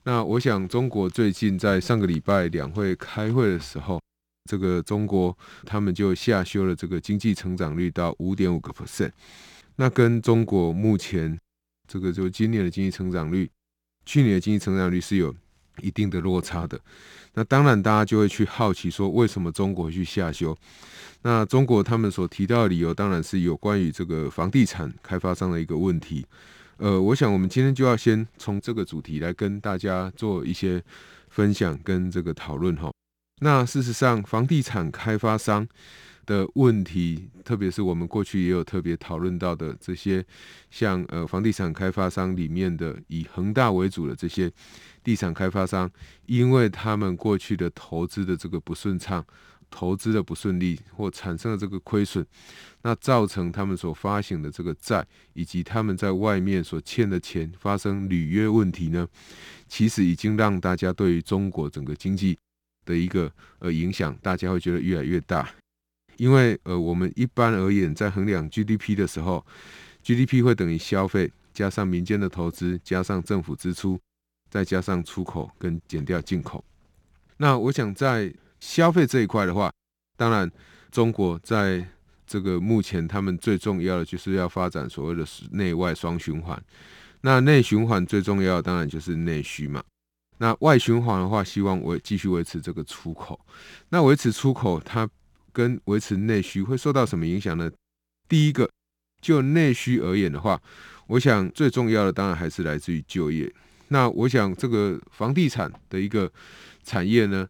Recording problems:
none

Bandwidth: 18.5 kHz